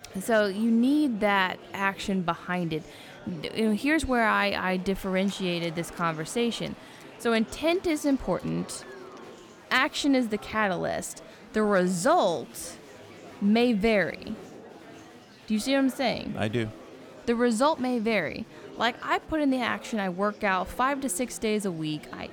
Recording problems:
murmuring crowd; noticeable; throughout; 20 dB below the speech

